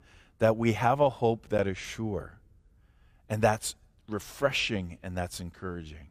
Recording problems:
none

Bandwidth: 15 kHz